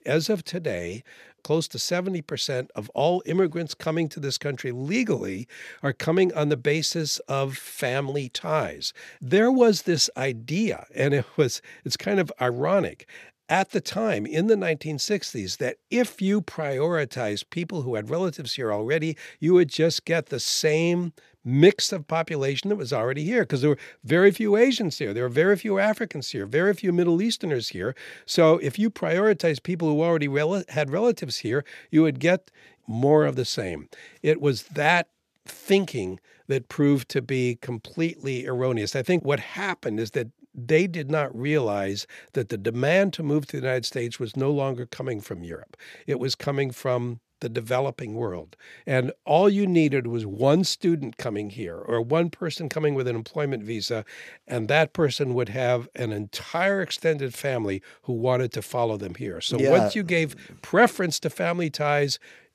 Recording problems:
none

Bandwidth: 14.5 kHz